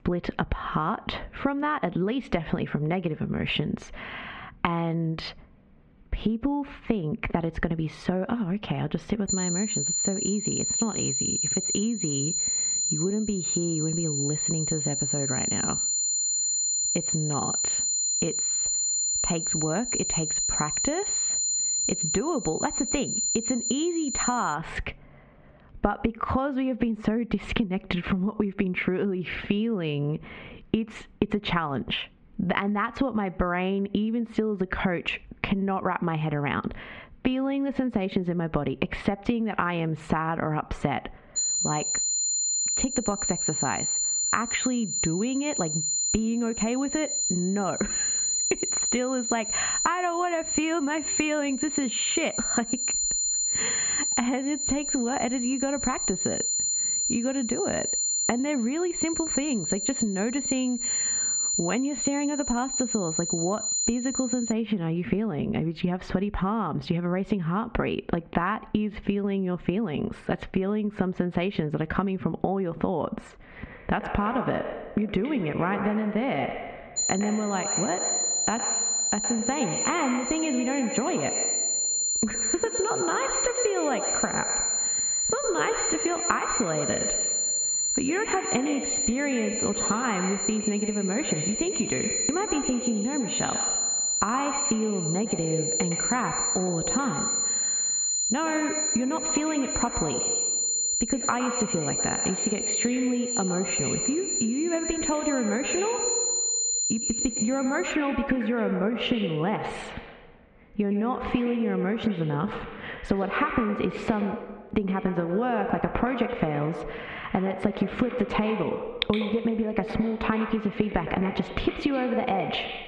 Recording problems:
echo of what is said; strong; from 1:14 on; 110 ms later, 7 dB below the speech
squashed, flat; heavily
muffled; slightly; fading above 2.5 kHz
high-pitched whine; loud; from 9.5 to 25 s, from 41 s to 1:05 and from 1:17 to 1:48; 7 kHz, 2 dB above the speech

